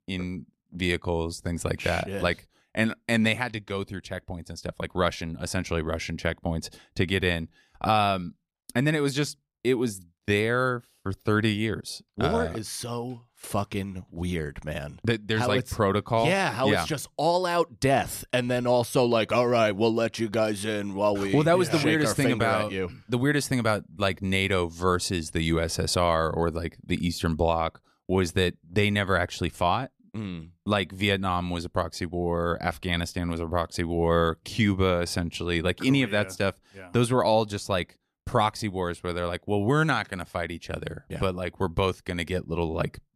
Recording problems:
none

